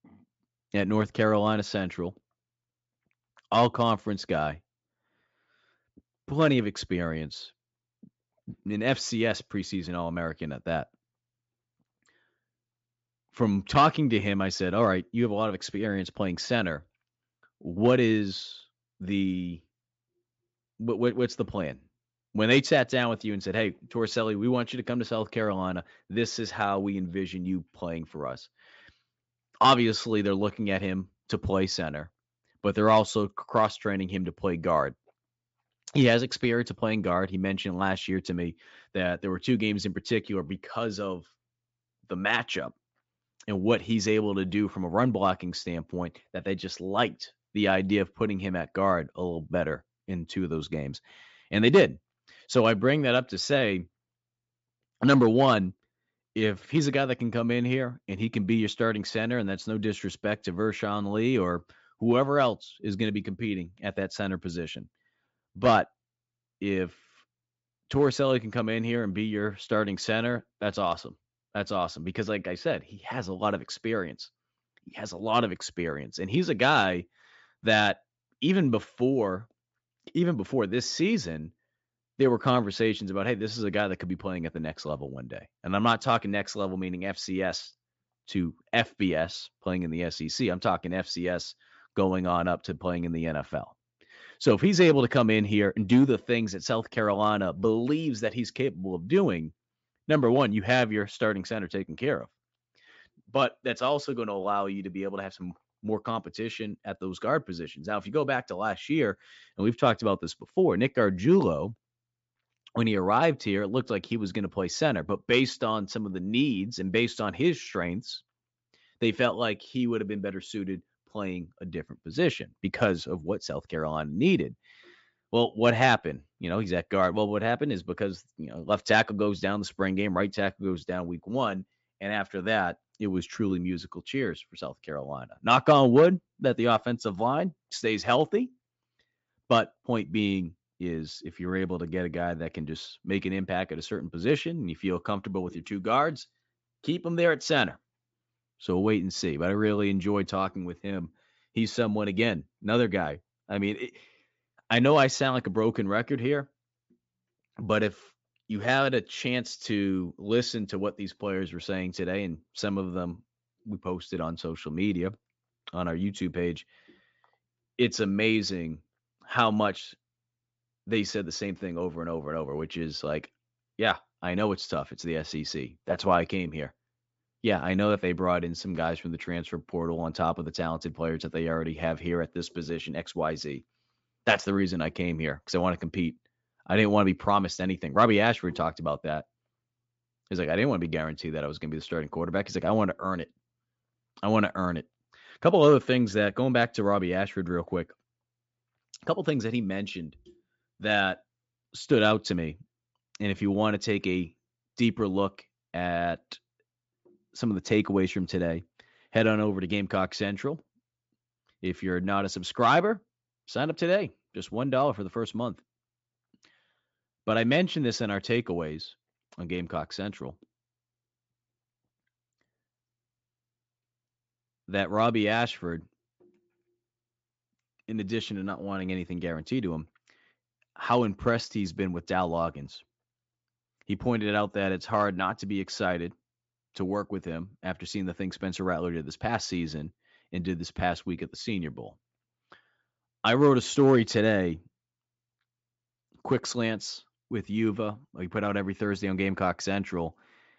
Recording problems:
high frequencies cut off; noticeable; nothing above 8 kHz

